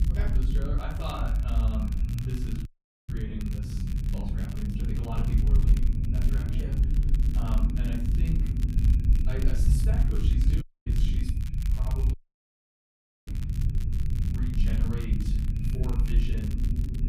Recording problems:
off-mic speech; far
room echo; noticeable; dies away in 0.5 s
echo of what is said; faint; throughout; 460 ms later, 25 dB below the speech
low rumble; loud; throughout; 1 dB below the speech
crackle, like an old record; noticeable; 10 dB below the speech
audio cutting out; at 2.5 s, at 11 s and at 12 s for 1 s

